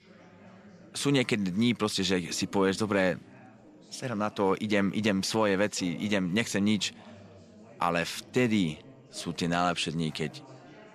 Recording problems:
background chatter; faint; throughout; 4 voices, 25 dB below the speech

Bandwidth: 13.5 kHz